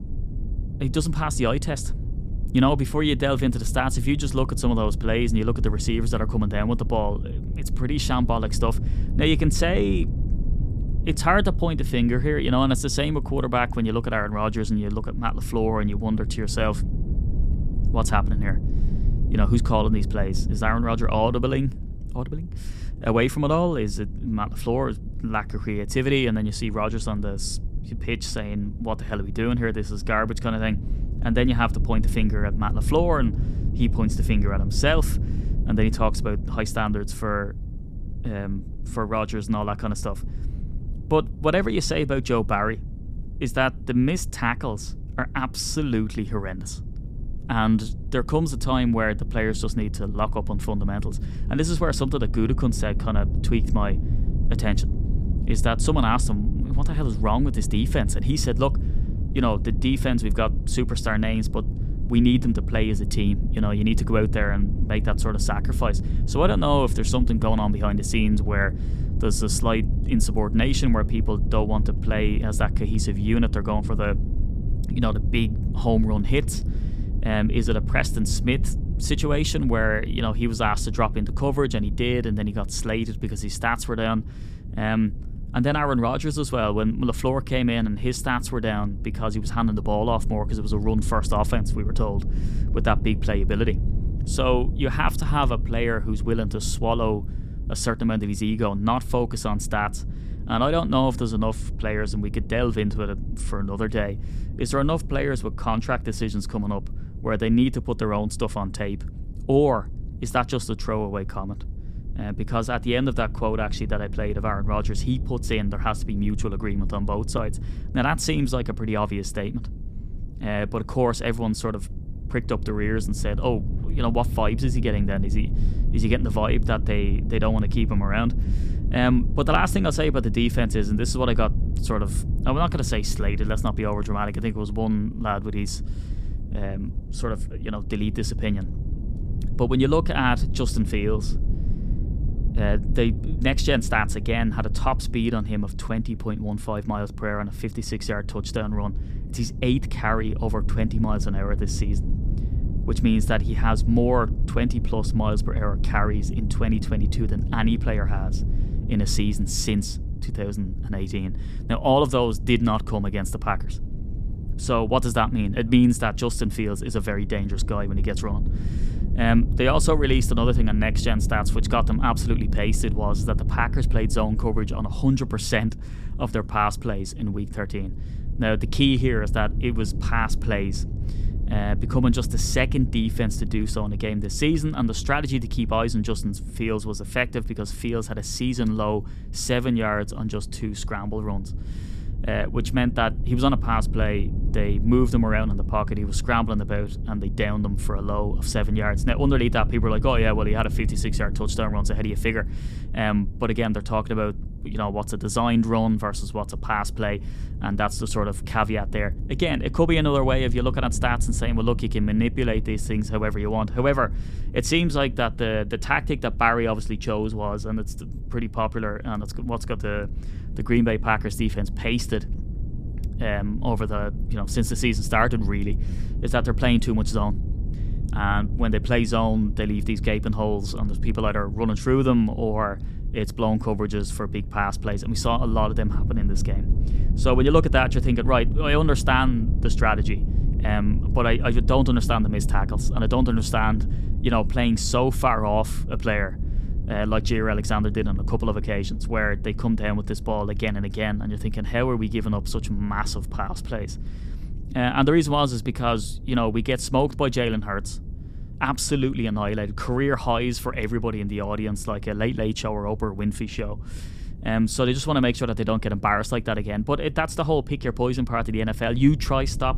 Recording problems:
low rumble; noticeable; throughout; 15 dB below the speech

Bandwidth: 14.5 kHz